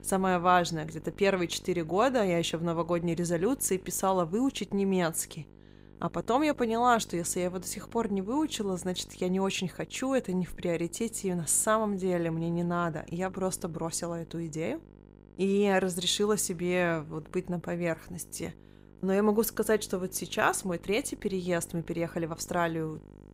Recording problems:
electrical hum; faint; throughout; 50 Hz, 25 dB below the speech

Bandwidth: 15.5 kHz